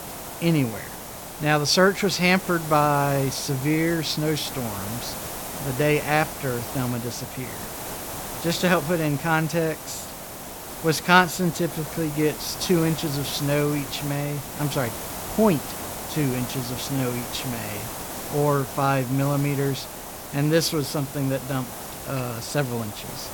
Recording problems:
hiss; loud; throughout; 9 dB below the speech

